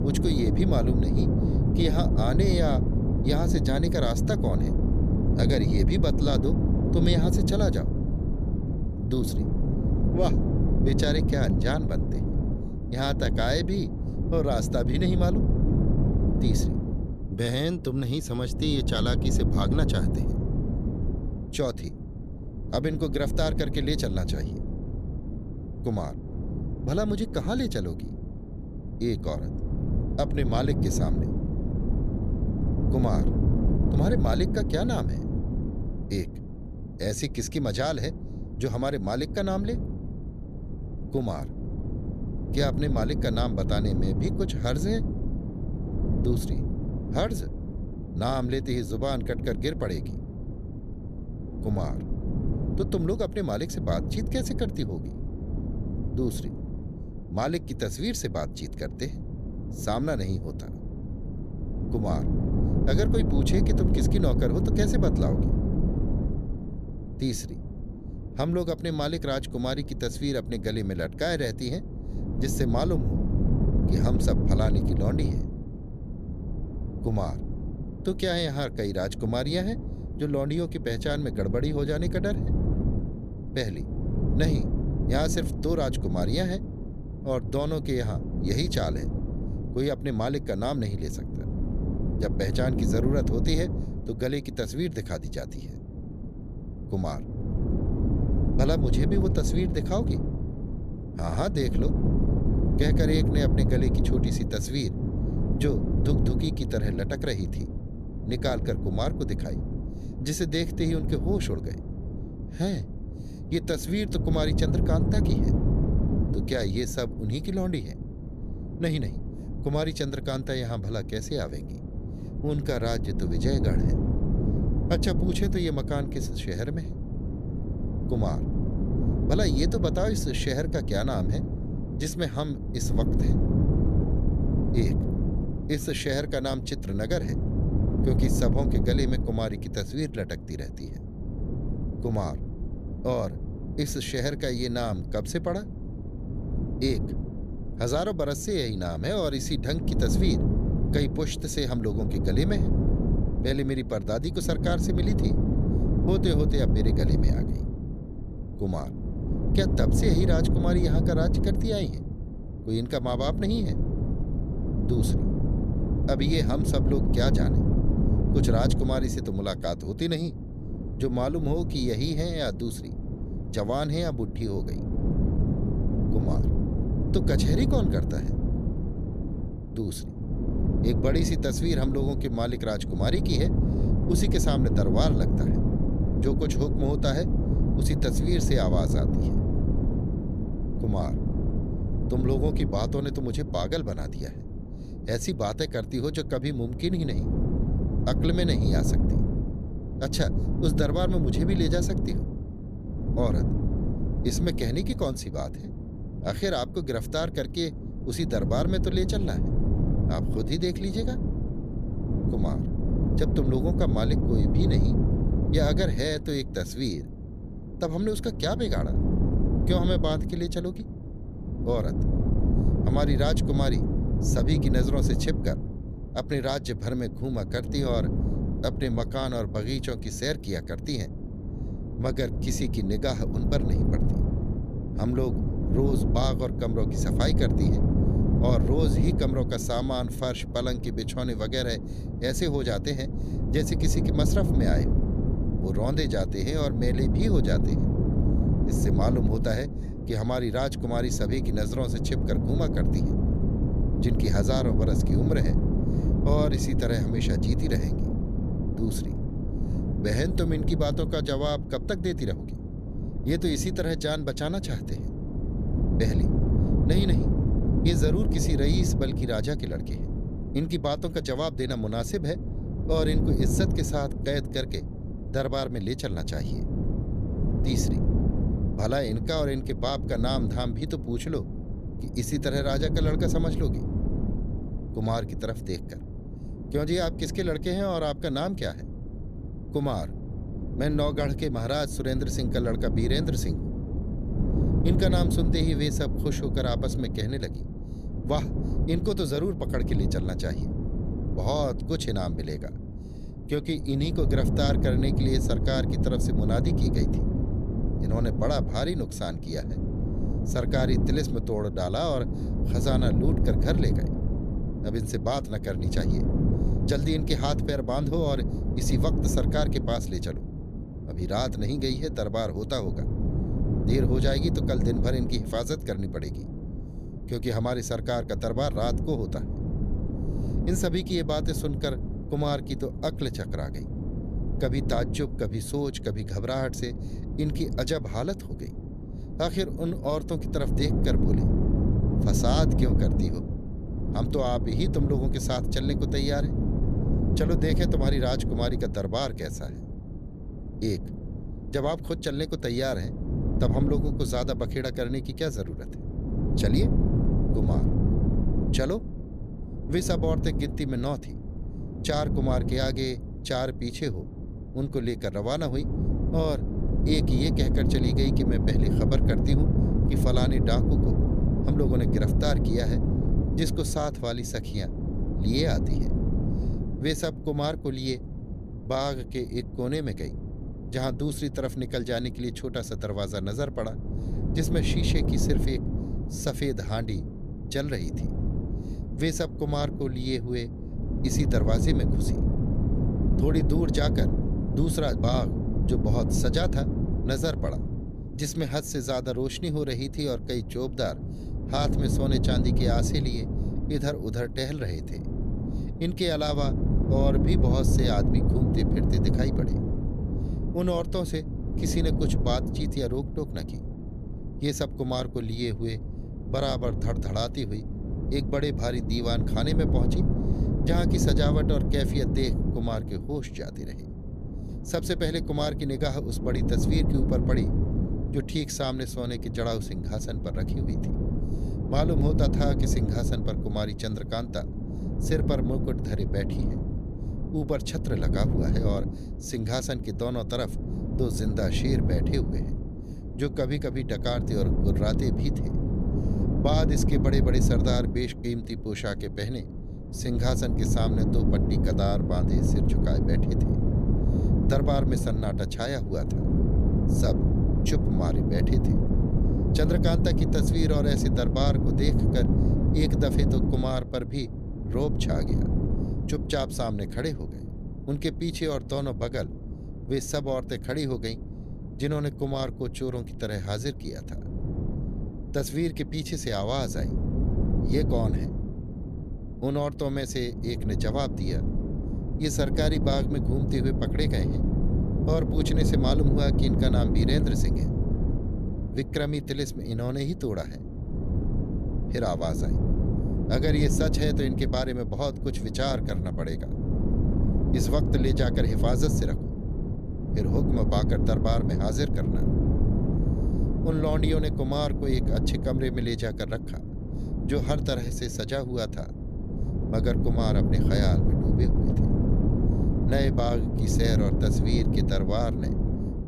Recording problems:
wind noise on the microphone; heavy; 5 dB below the speech

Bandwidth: 14.5 kHz